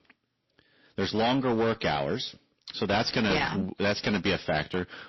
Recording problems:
distortion; heavy; 11% of the sound clipped
garbled, watery; slightly; nothing above 5.5 kHz

